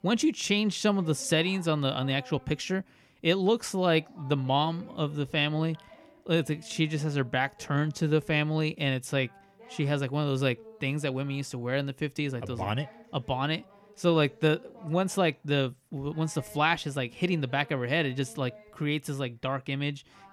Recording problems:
voice in the background; faint; throughout; 25 dB below the speech

